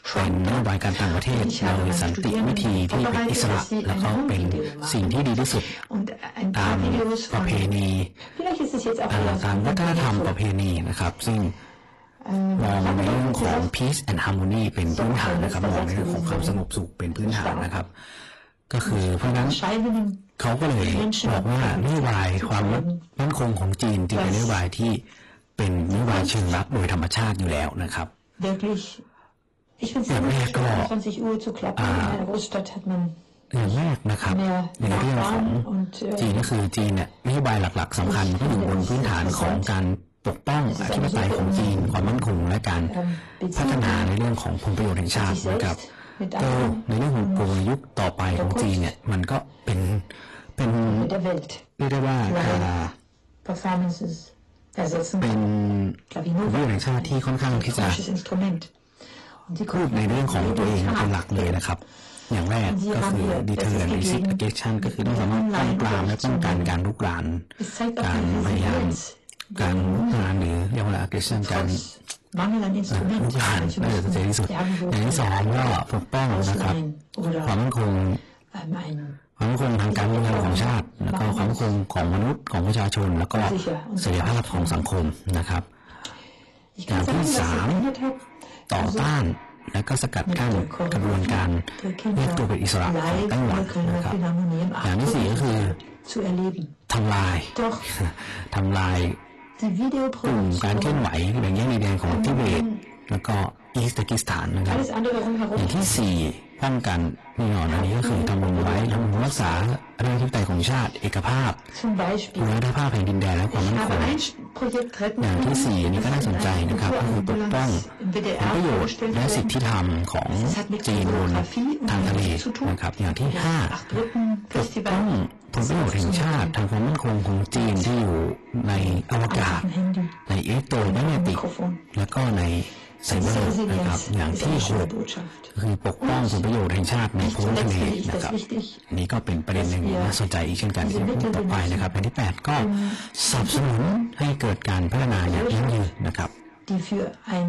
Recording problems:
distortion; heavy; 31% of the sound clipped
echo of what is said; faint; from 1:27 on; 300 ms later, 25 dB below the speech
garbled, watery; slightly; nothing above 11.5 kHz
voice in the background; loud; throughout; 3 dB below the speech

